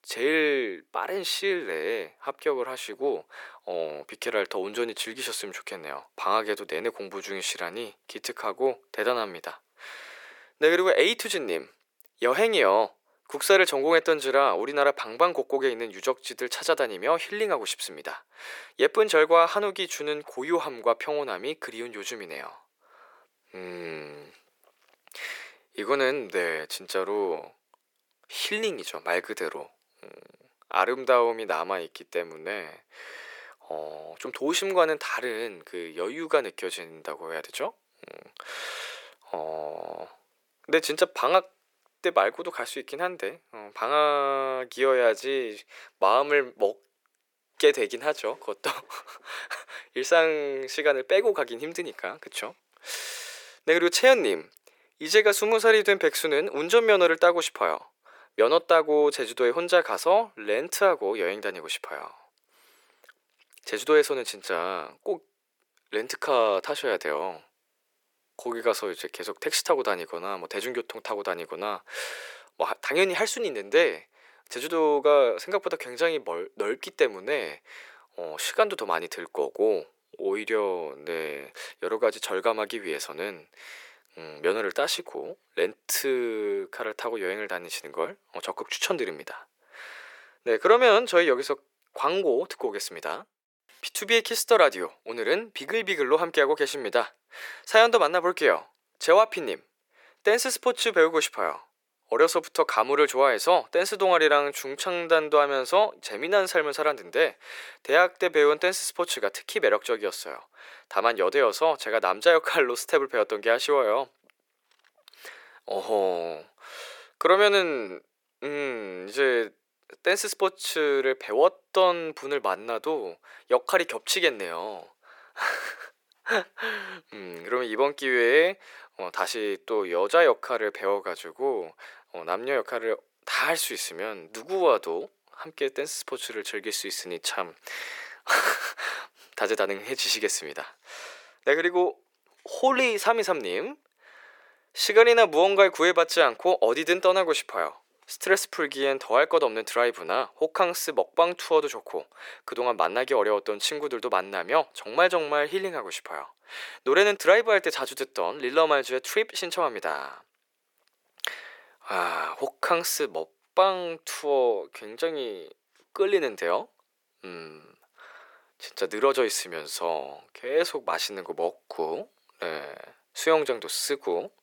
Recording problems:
thin; very; fading below 400 Hz

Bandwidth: 18 kHz